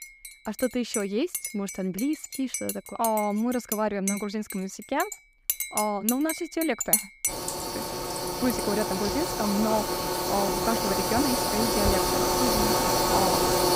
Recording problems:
household noises; very loud; throughout; 2 dB above the speech

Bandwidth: 15.5 kHz